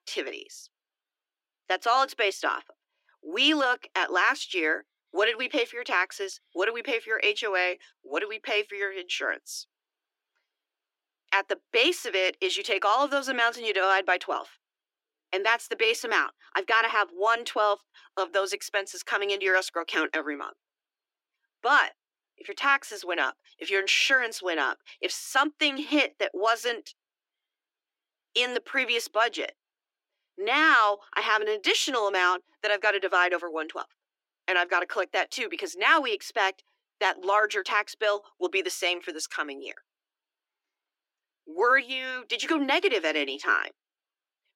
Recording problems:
thin; very; fading below 300 Hz

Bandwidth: 16 kHz